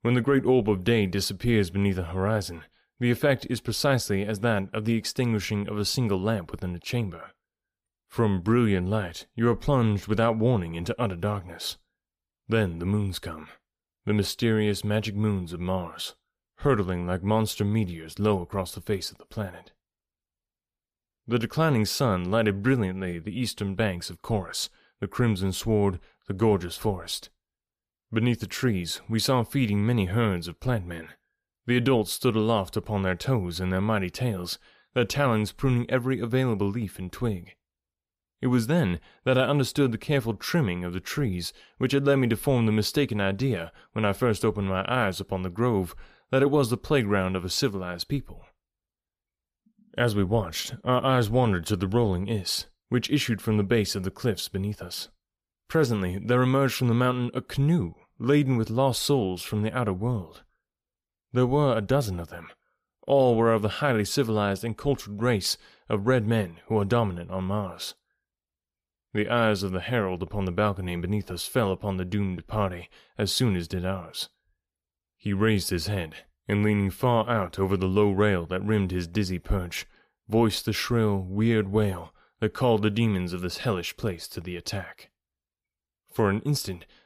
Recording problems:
none

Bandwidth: 14.5 kHz